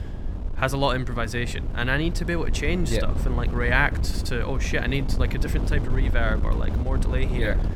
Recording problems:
wind noise on the microphone; occasional gusts; 10 dB below the speech

